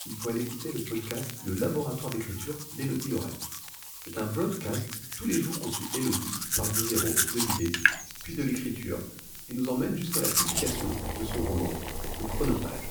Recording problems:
off-mic speech; far
room echo; slight; dies away in 0.5 s
household noises; very loud; throughout; 3 dB above the speech
hiss; loud; throughout; 9 dB below the speech
animal sounds; noticeable; until 8.5 s; 15 dB below the speech
crackle, like an old record; noticeable; 15 dB below the speech

